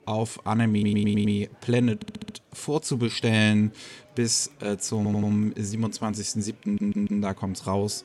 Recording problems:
murmuring crowd; faint; throughout; 30 dB below the speech
audio stuttering; 4 times, first at 0.5 s

